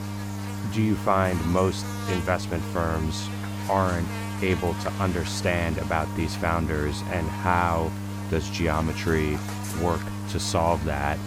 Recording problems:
electrical hum; loud; throughout; 50 Hz, 9 dB below the speech

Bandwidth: 17.5 kHz